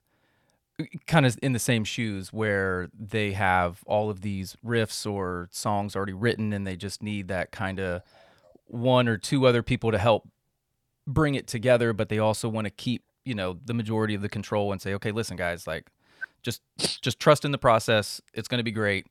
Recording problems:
none

